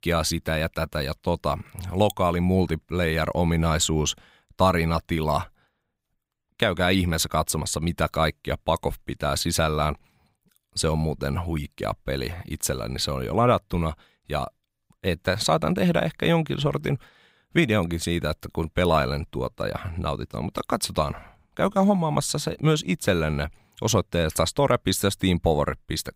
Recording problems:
none

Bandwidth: 15.5 kHz